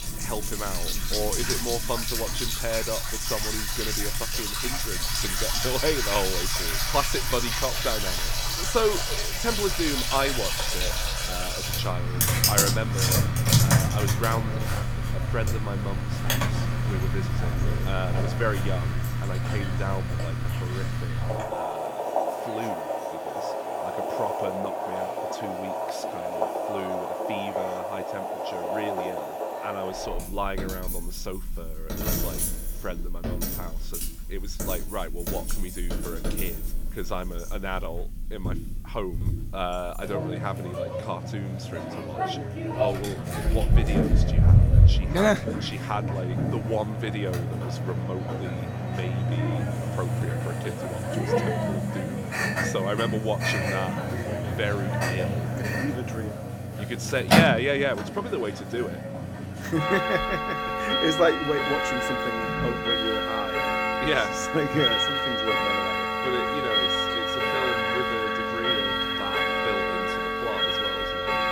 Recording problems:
household noises; very loud; throughout; 5 dB above the speech

